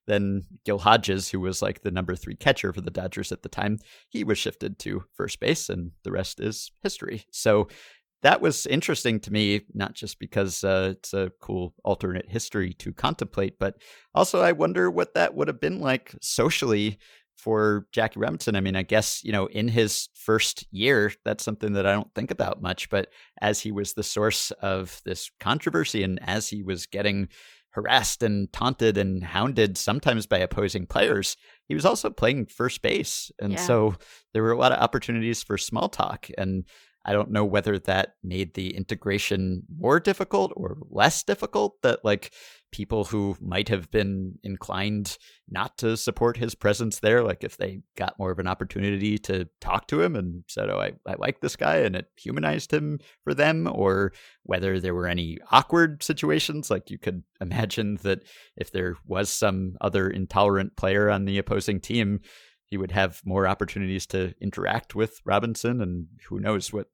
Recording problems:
none

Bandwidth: 19 kHz